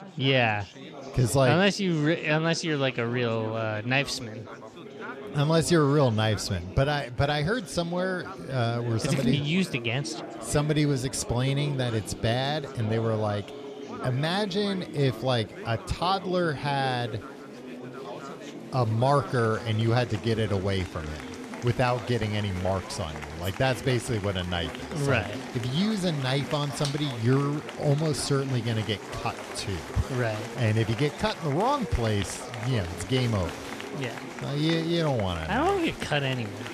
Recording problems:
chatter from many people; noticeable; throughout; 10 dB below the speech

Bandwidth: 14 kHz